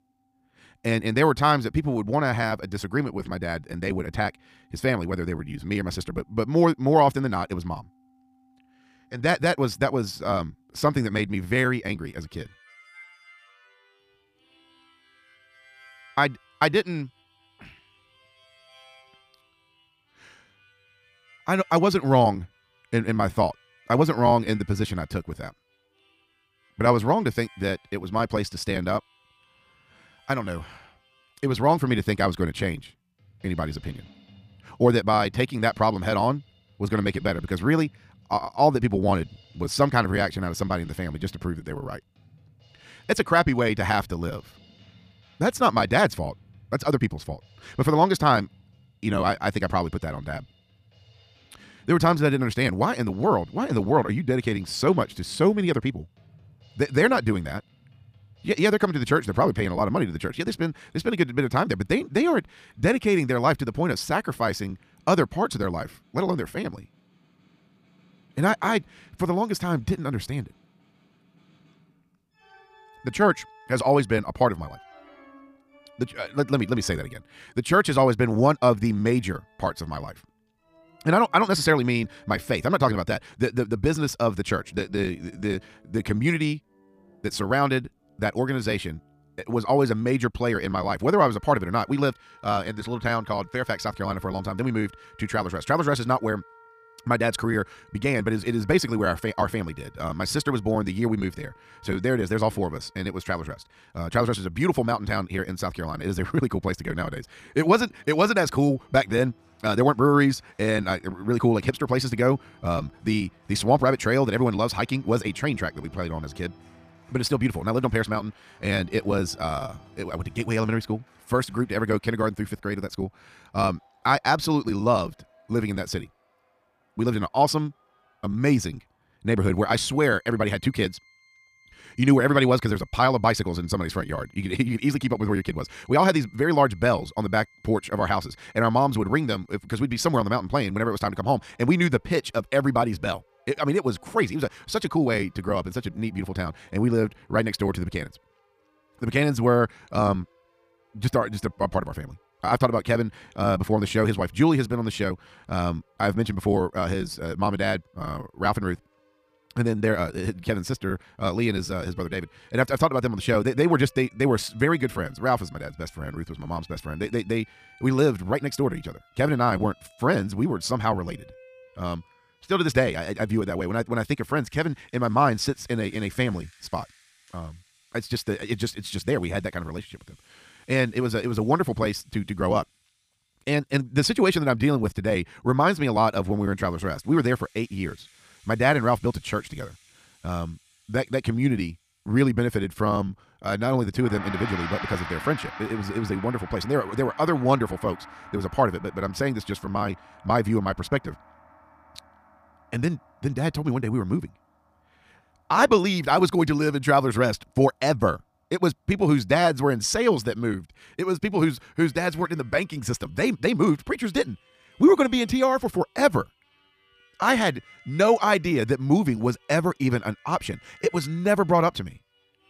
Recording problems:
wrong speed, natural pitch; too fast; 1.5 times normal speed
background music; faint; throughout; 25 dB below the speech

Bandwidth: 15 kHz